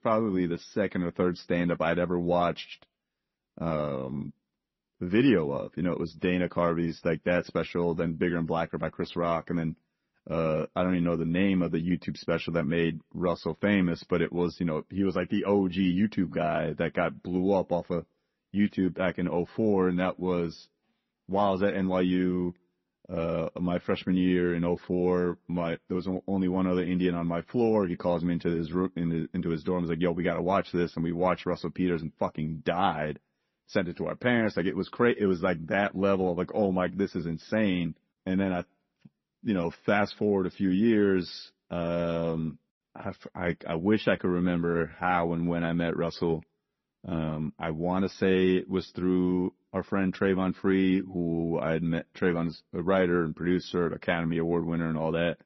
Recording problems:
garbled, watery; slightly; nothing above 6 kHz

